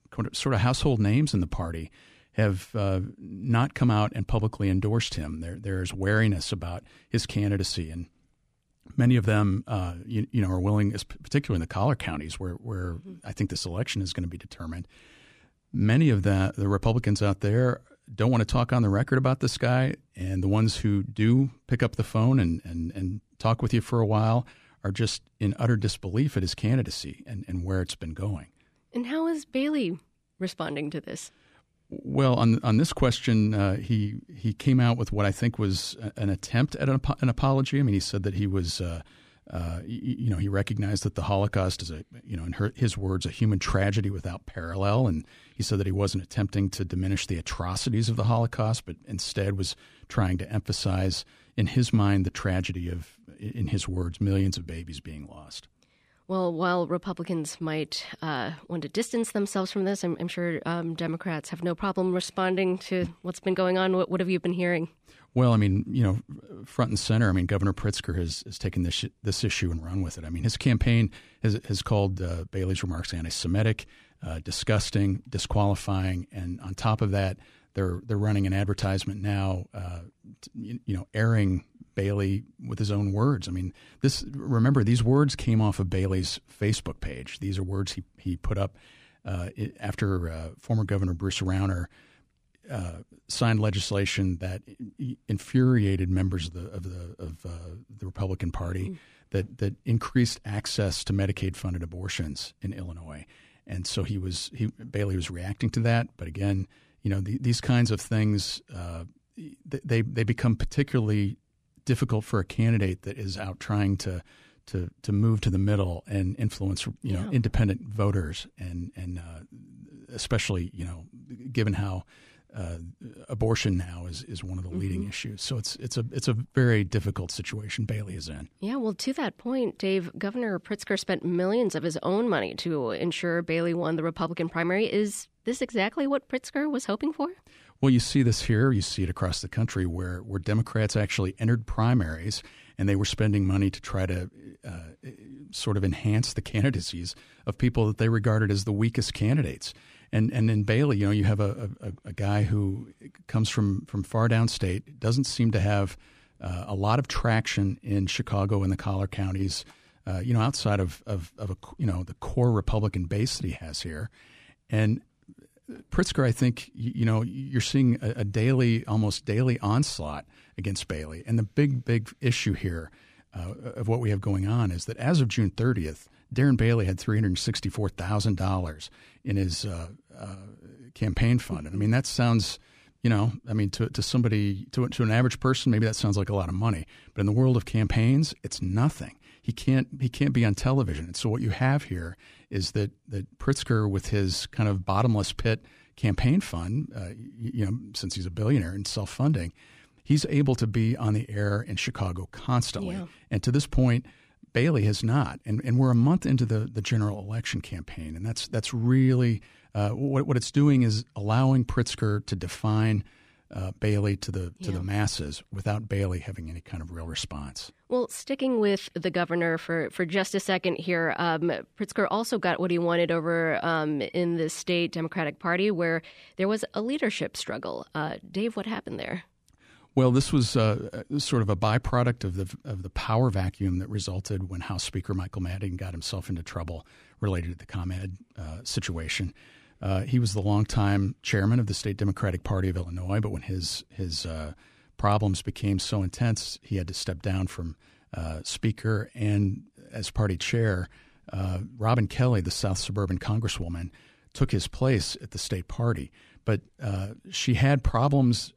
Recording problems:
none

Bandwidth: 15 kHz